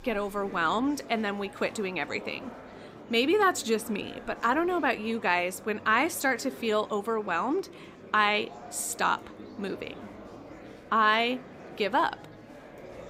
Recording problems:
murmuring crowd; noticeable; throughout; 20 dB below the speech

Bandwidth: 15.5 kHz